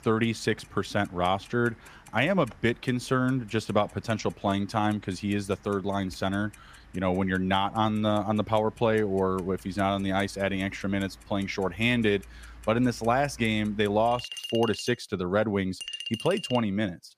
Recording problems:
household noises; noticeable; throughout; 15 dB below the speech

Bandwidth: 15 kHz